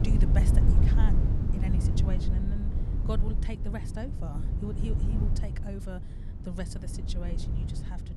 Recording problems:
wind noise on the microphone; heavy; as loud as the speech

